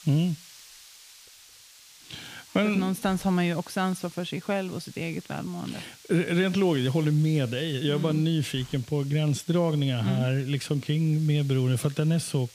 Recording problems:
hiss; faint; throughout; 20 dB below the speech

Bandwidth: 15 kHz